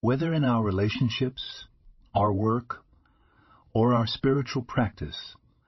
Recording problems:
garbled, watery; slightly; nothing above 5.5 kHz

